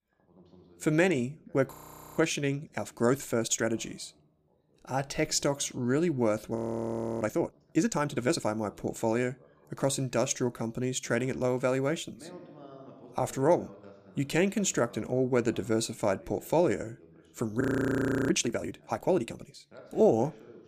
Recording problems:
voice in the background; faint; throughout; 25 dB below the speech
audio freezing; at 1.5 s, at 6.5 s for 0.5 s and at 18 s for 0.5 s

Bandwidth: 15 kHz